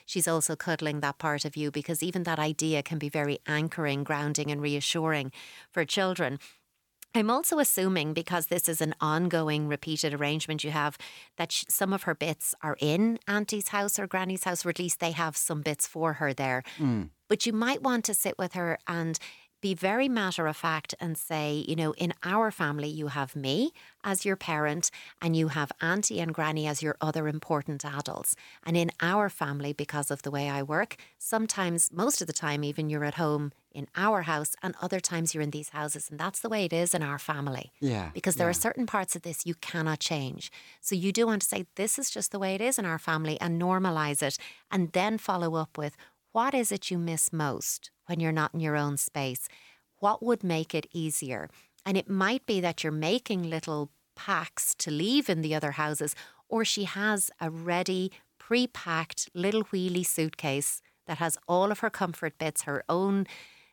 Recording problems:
none

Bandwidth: 18 kHz